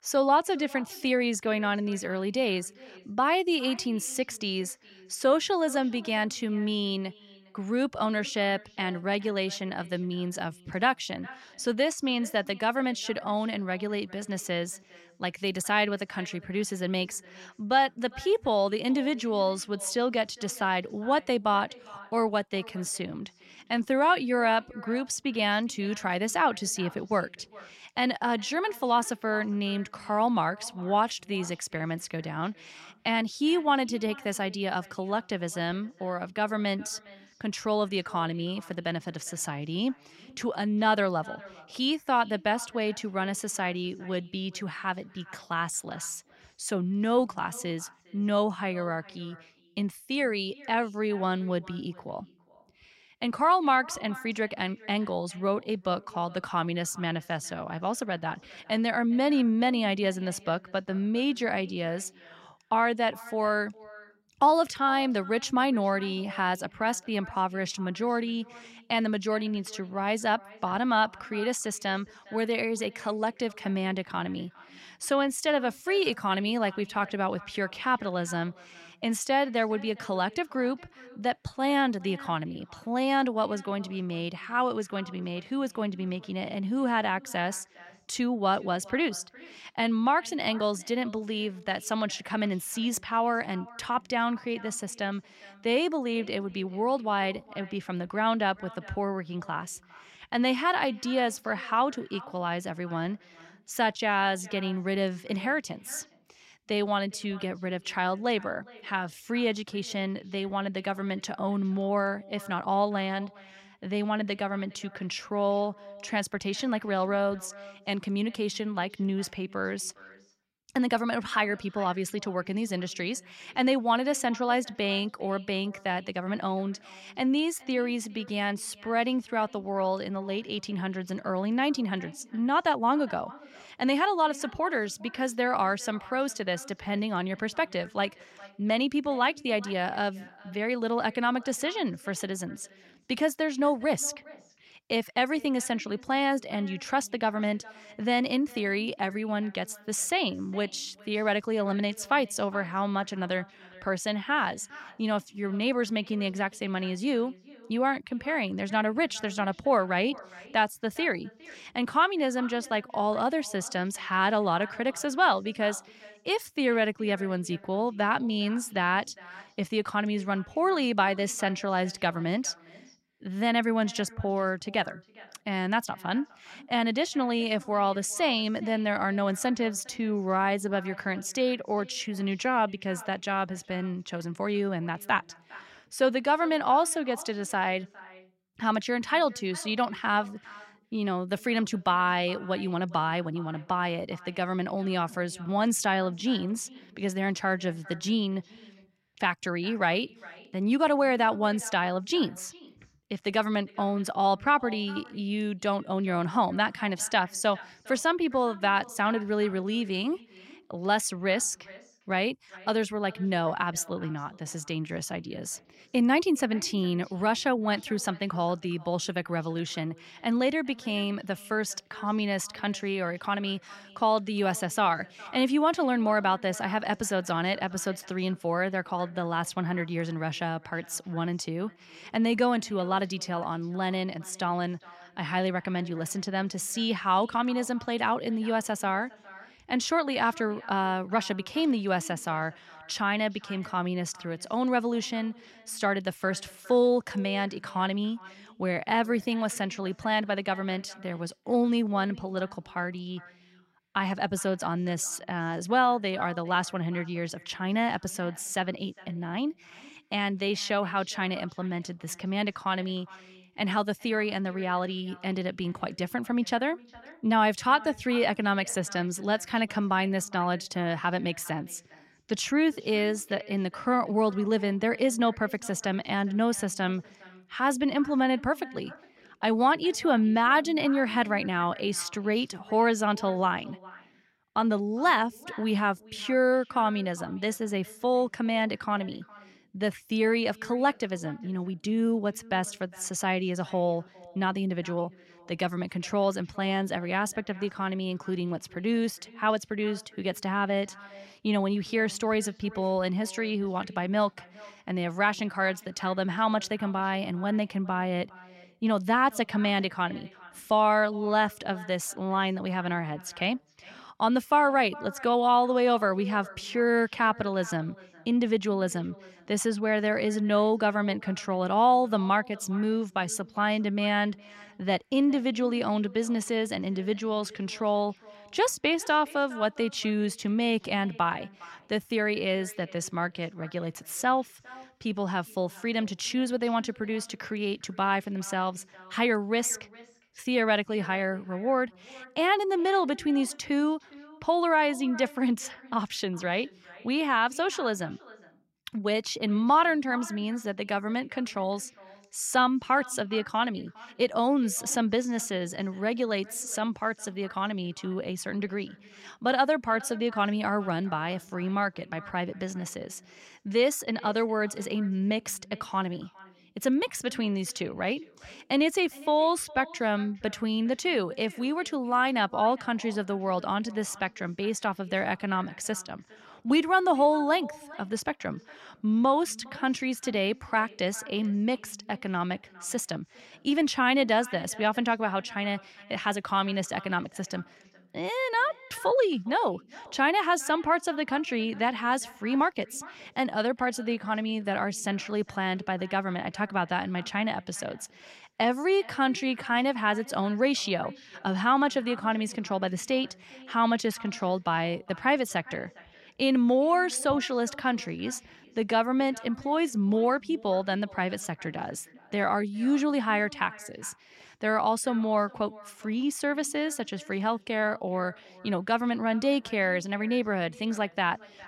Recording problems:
echo of what is said; faint; throughout; 410 ms later, 20 dB below the speech

